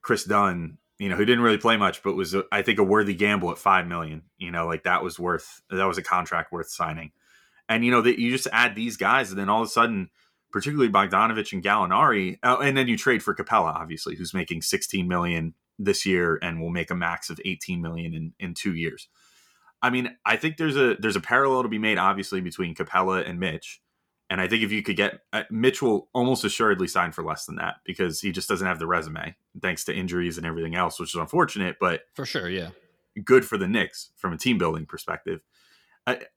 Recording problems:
none

